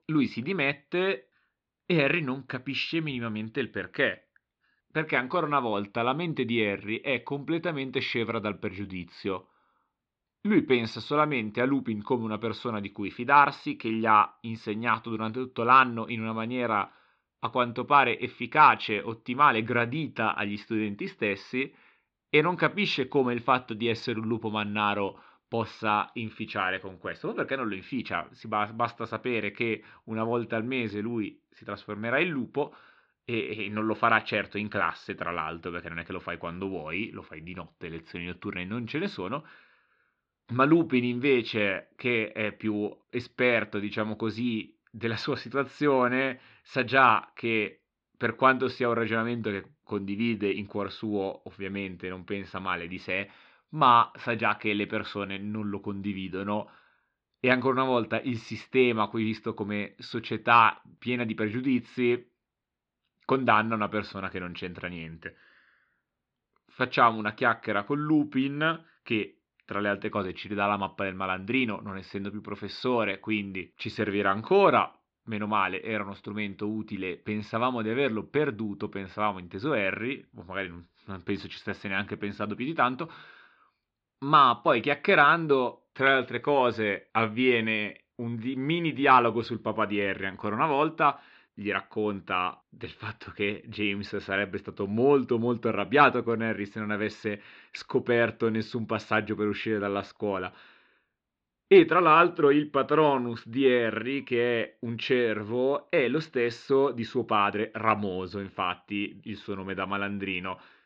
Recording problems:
muffled; slightly; fading above 4 kHz

